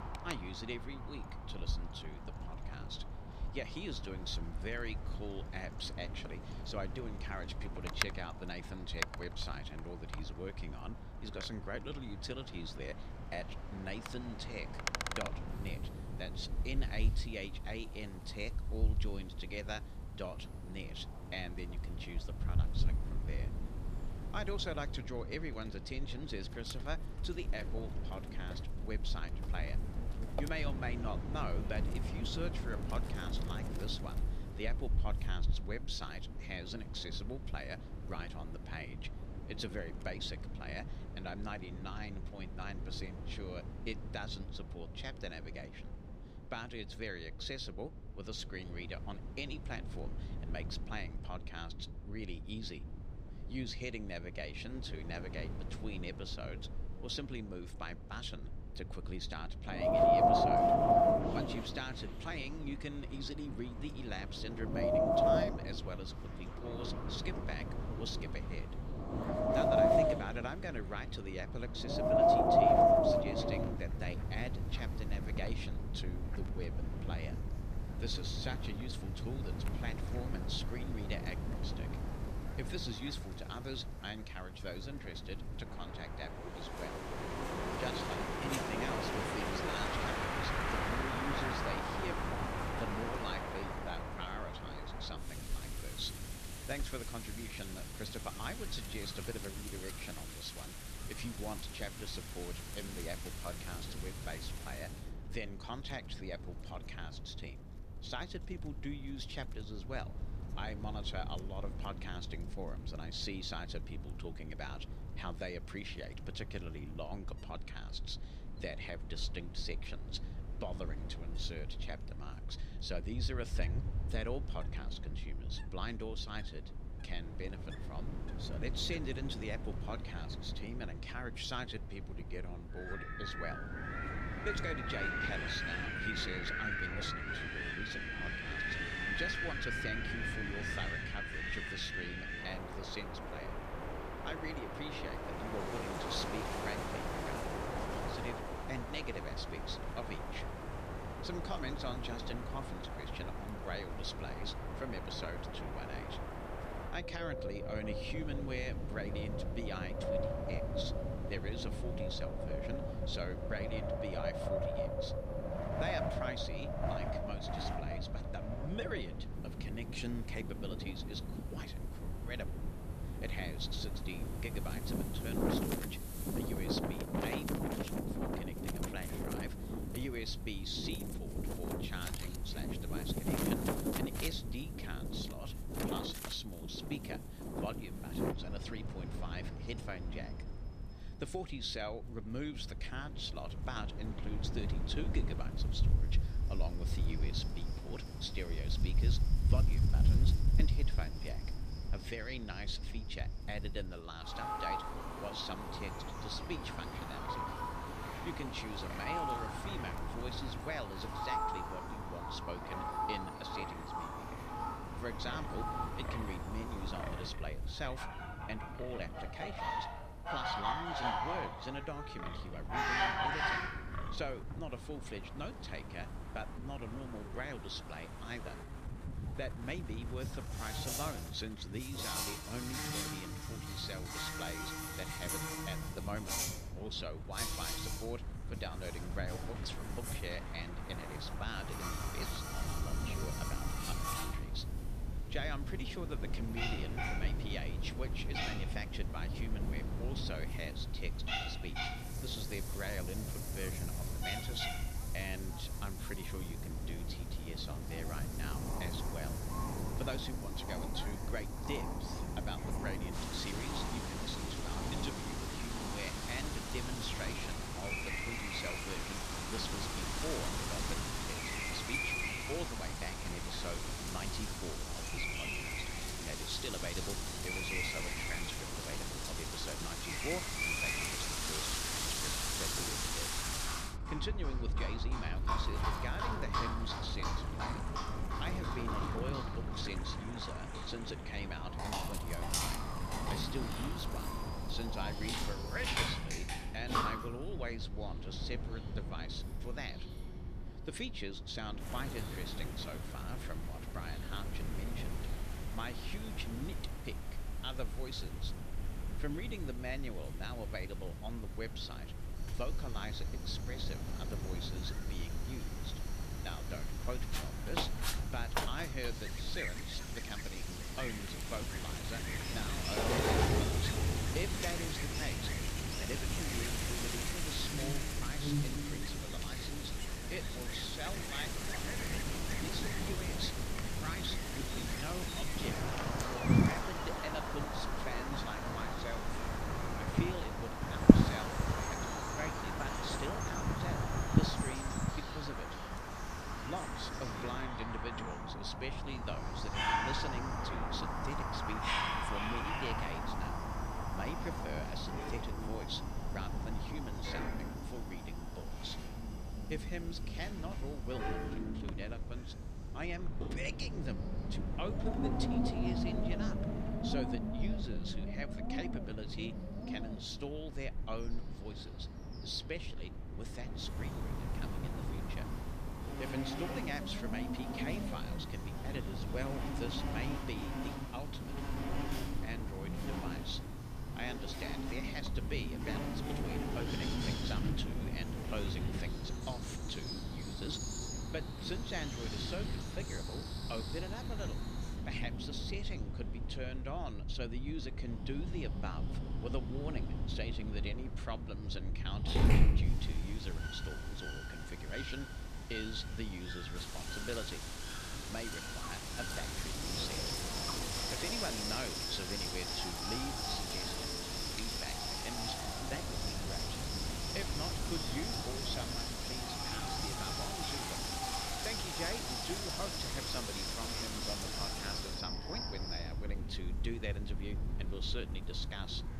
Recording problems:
wind in the background; very loud; throughout; 4 dB above the speech
animal sounds; very loud; from 3:16 on; 2 dB above the speech
wind noise on the microphone; occasional gusts; until 3:21 and from 3:57 on; 15 dB below the speech

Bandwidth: 14.5 kHz